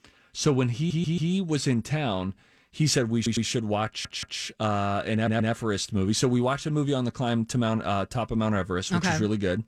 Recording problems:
audio stuttering; 4 times, first at 1 s

